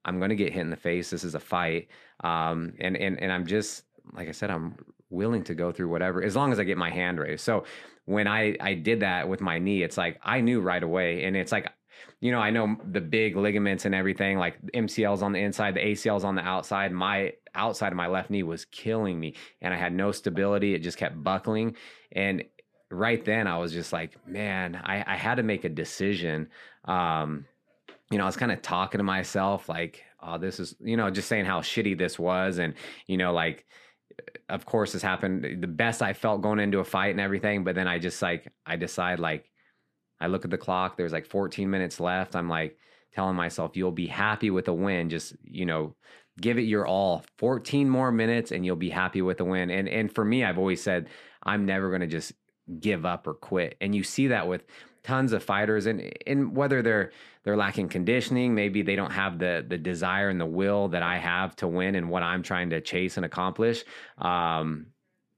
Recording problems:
none

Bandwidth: 14.5 kHz